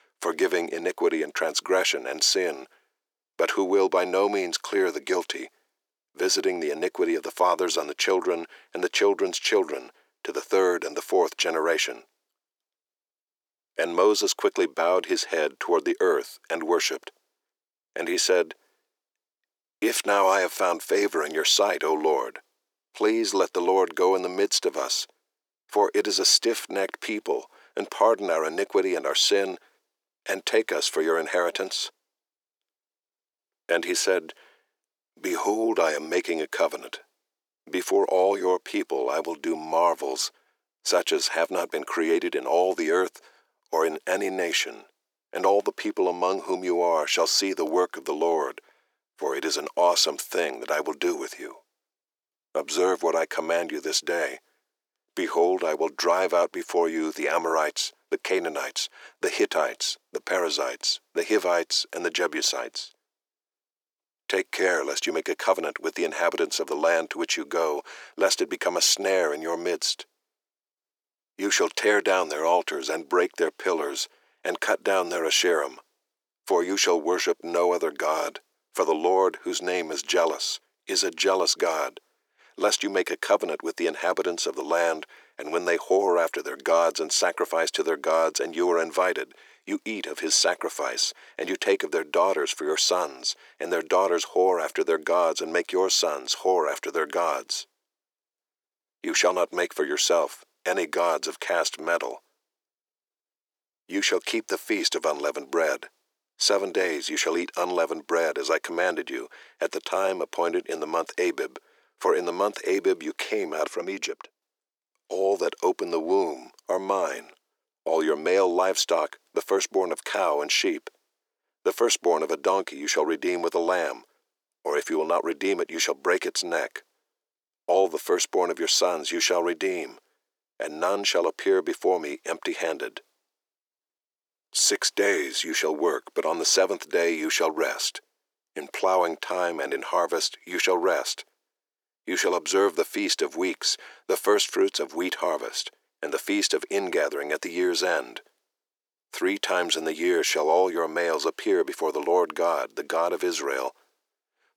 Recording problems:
thin; very; fading below 350 Hz

